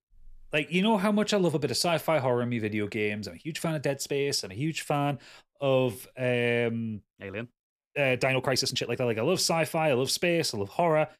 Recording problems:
uneven, jittery; strongly; from 3.5 to 9 s

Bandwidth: 14.5 kHz